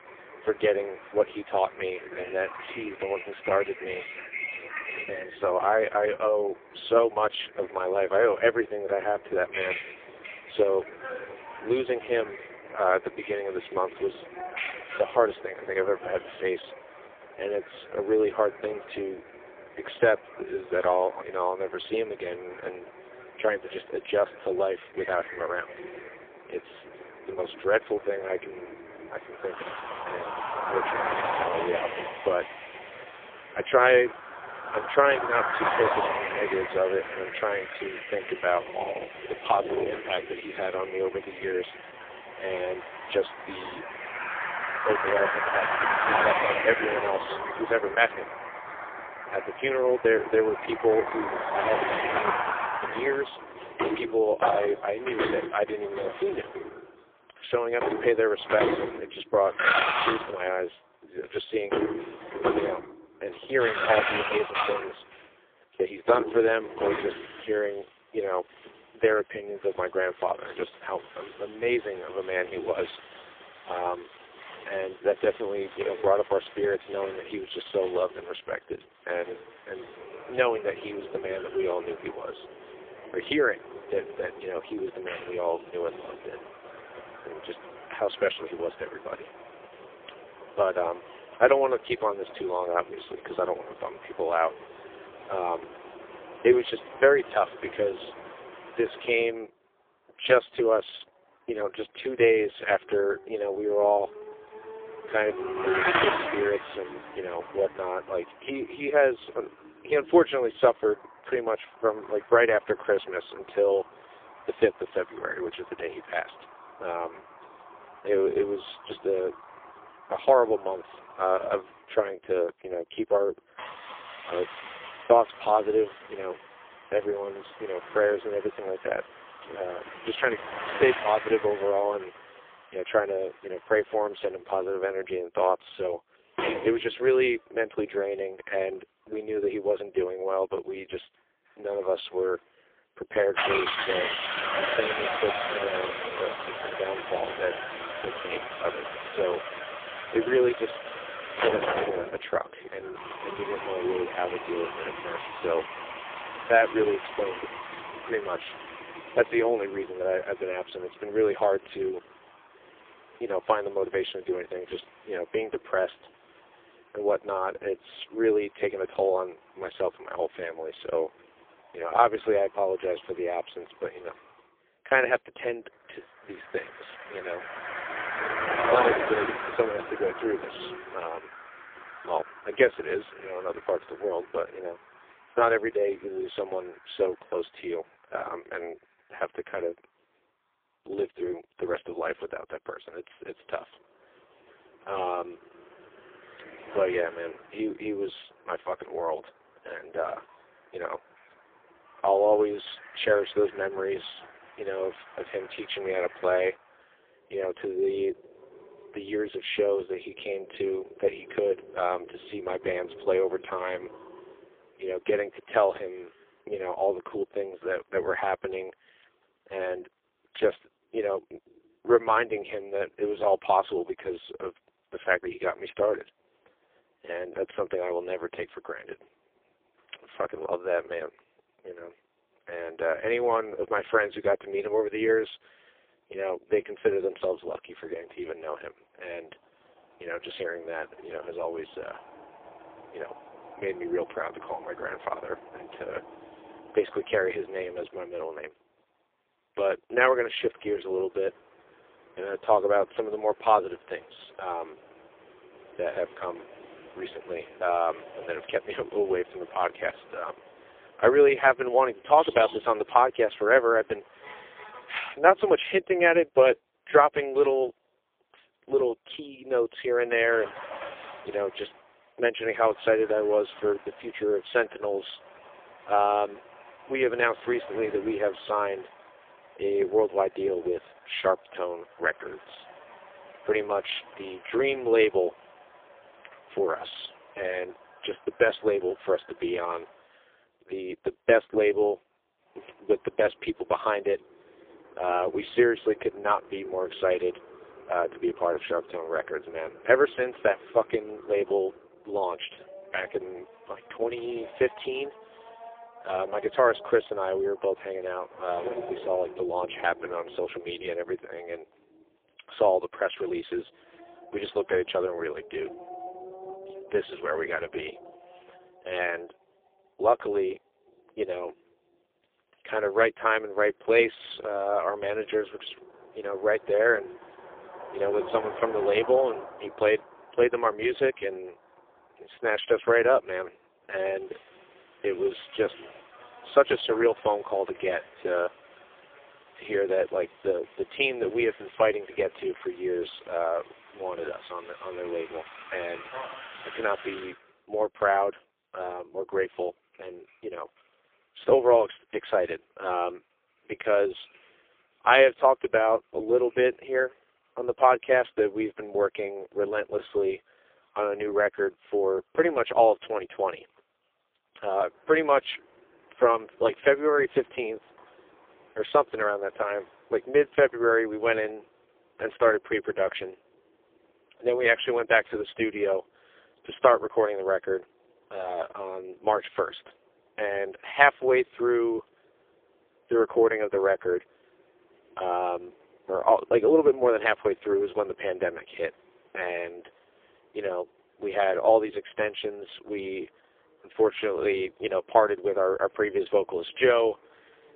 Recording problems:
phone-call audio; poor line; nothing above 3.5 kHz
traffic noise; loud; throughout; 8 dB below the speech

